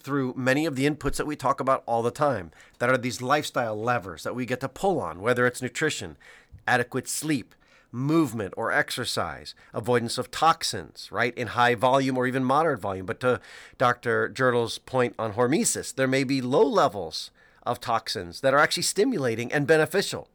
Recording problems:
none

